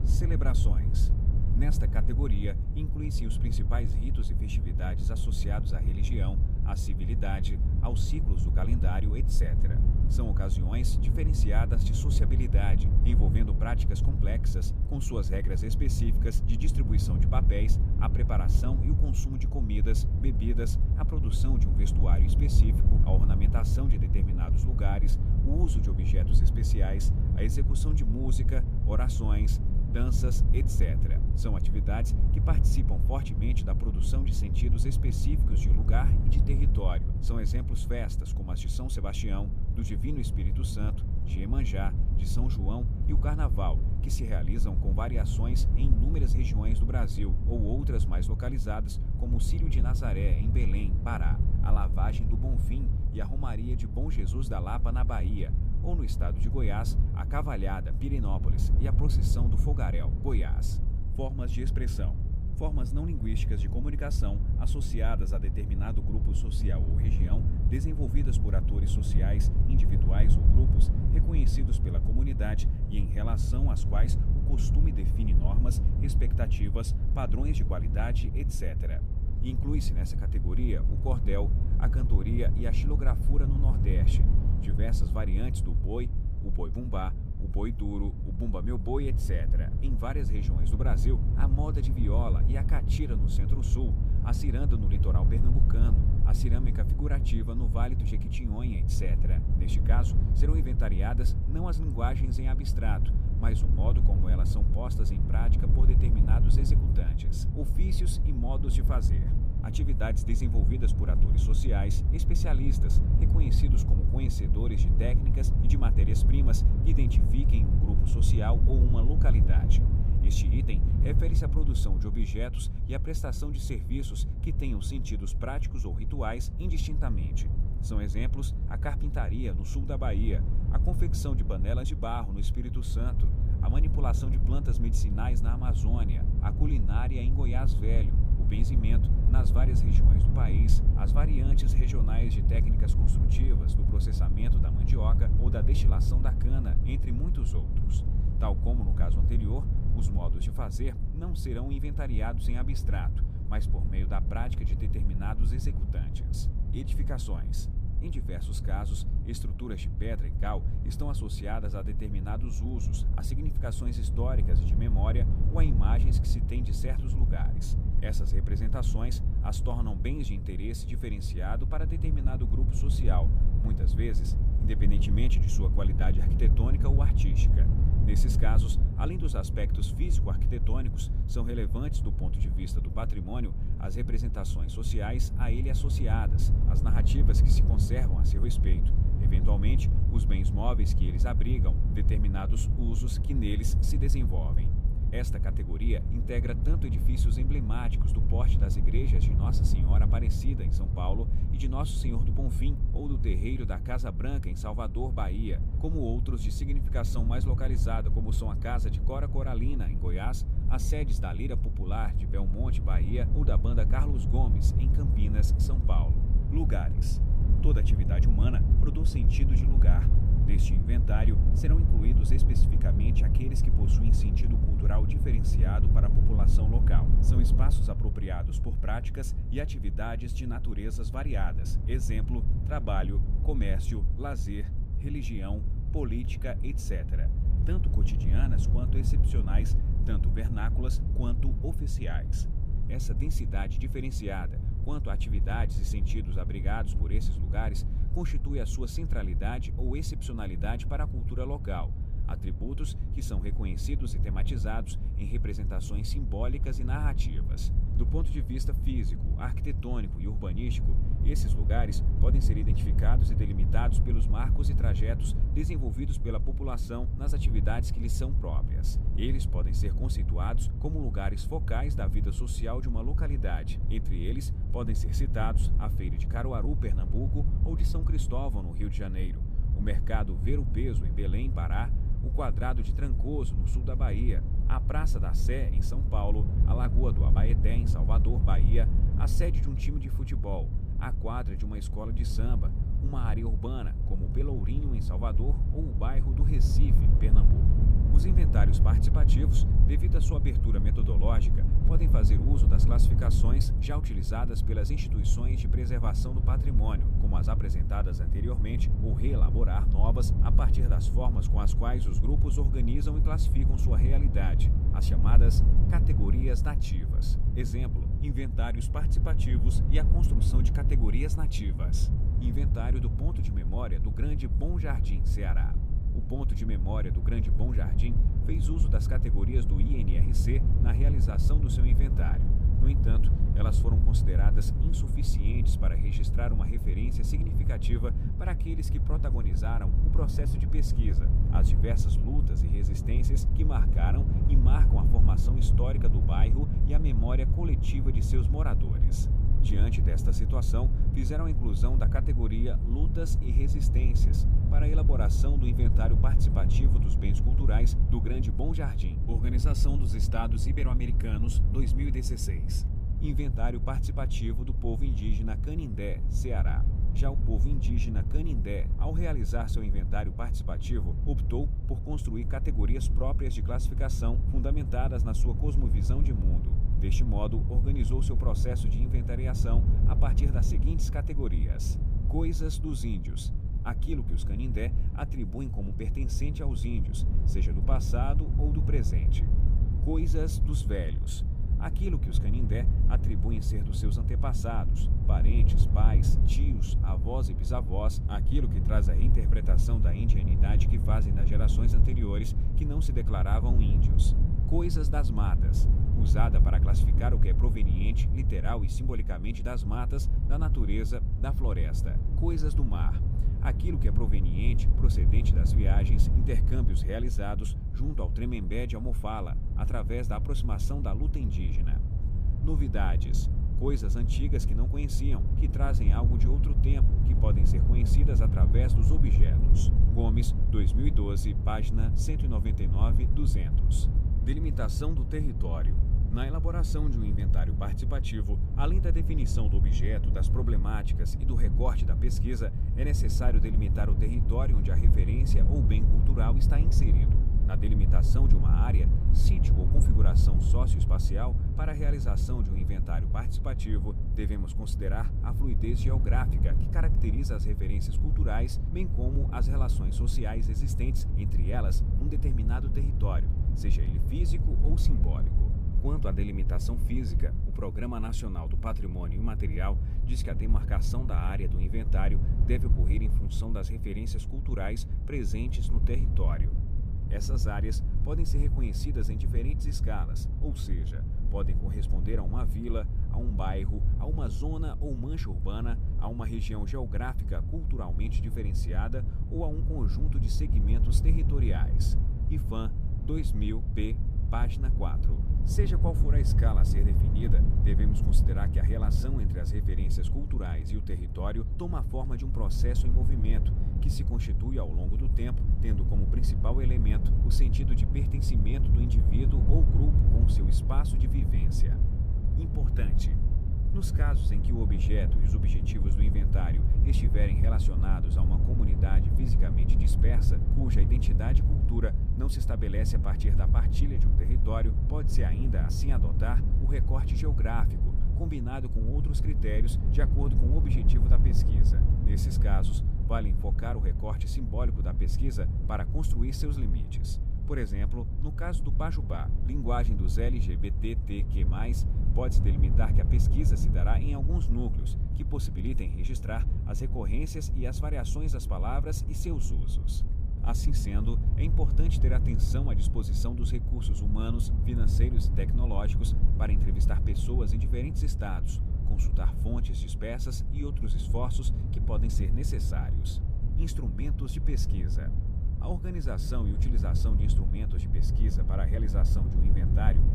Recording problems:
wind noise on the microphone; heavy; 3 dB below the speech

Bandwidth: 15 kHz